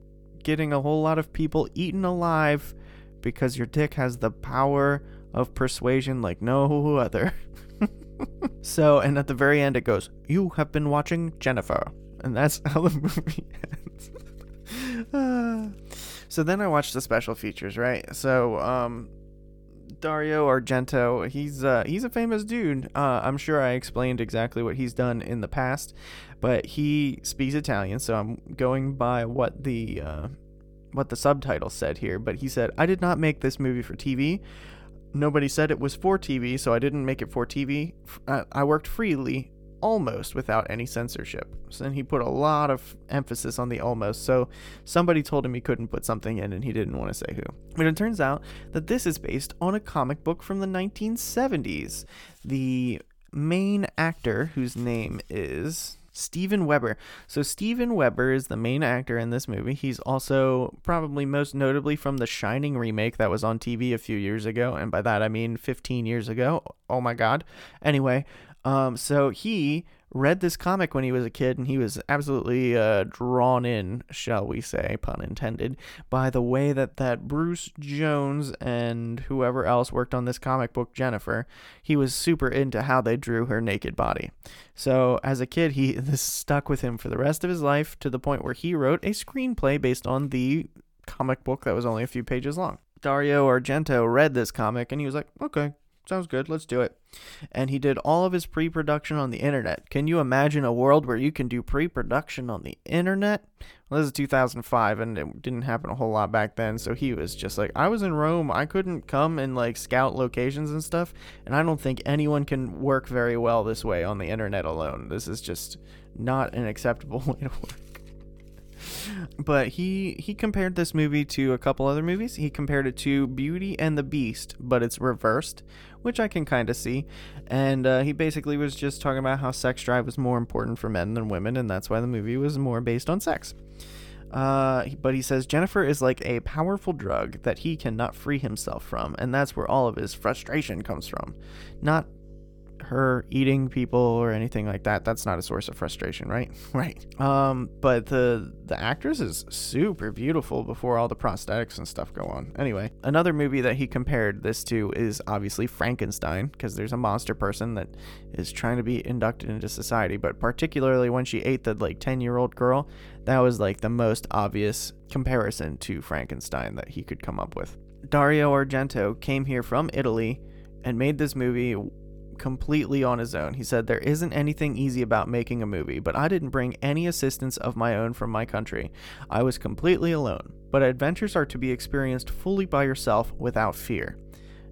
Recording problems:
electrical hum; faint; until 52 s and from 1:47 on; 50 Hz, 30 dB below the speech

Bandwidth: 18 kHz